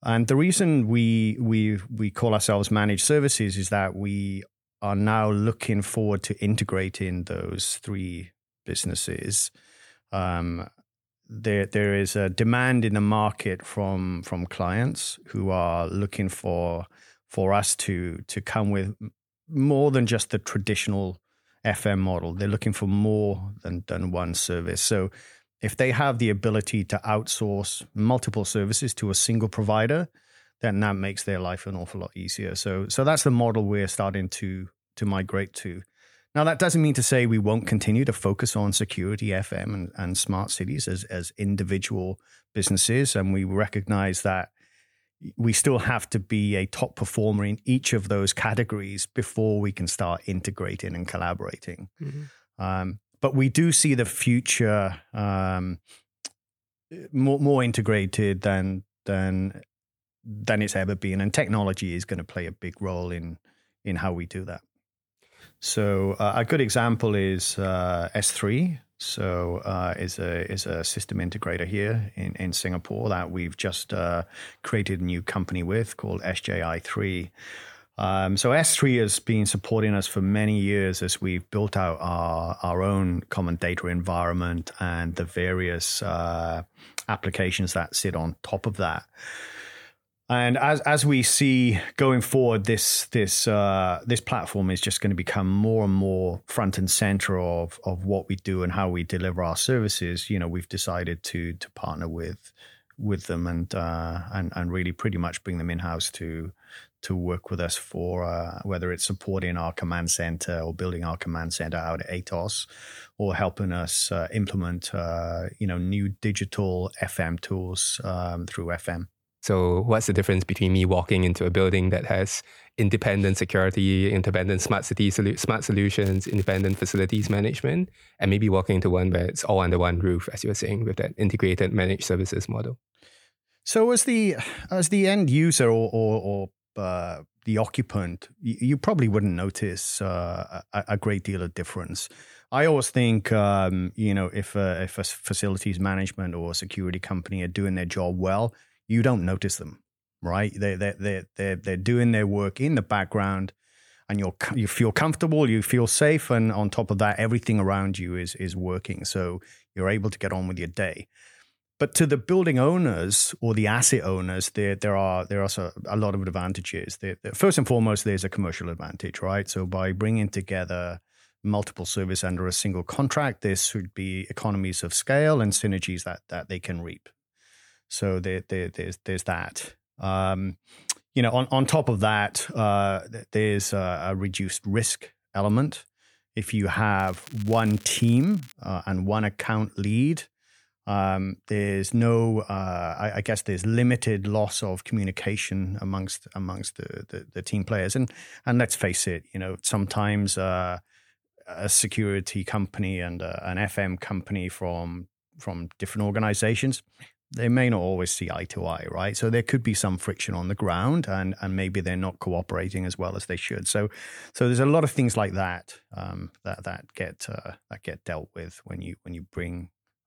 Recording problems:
crackling; faint; from 2:06 to 2:07 and from 3:07 to 3:09; 20 dB below the speech

